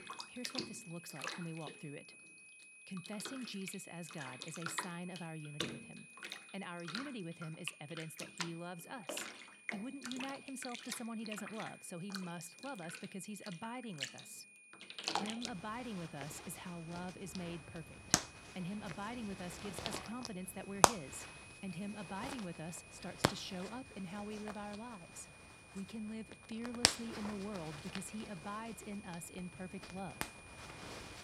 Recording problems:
household noises; very loud; throughout; 5 dB above the speech
high-pitched whine; noticeable; throughout; 2.5 kHz, 10 dB below the speech

